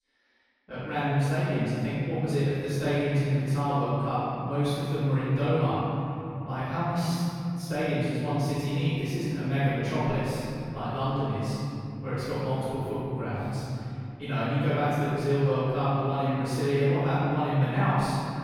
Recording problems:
room echo; strong; dies away in 3 s
off-mic speech; far

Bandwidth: 18 kHz